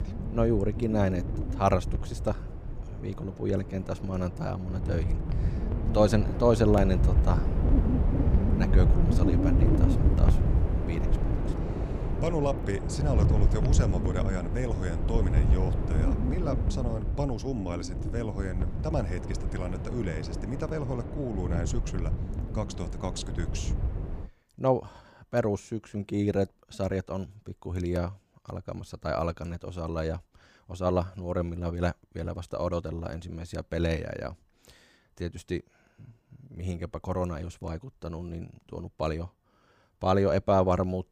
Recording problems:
wind noise on the microphone; heavy; until 24 s; 6 dB below the speech

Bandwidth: 15 kHz